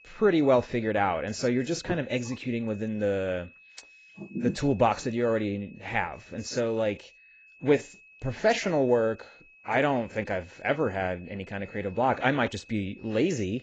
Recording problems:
garbled, watery; badly; nothing above 7.5 kHz
high-pitched whine; faint; throughout; 2.5 kHz, 25 dB below the speech

